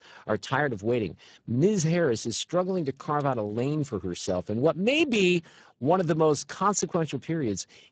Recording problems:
garbled, watery; badly; nothing above 7.5 kHz

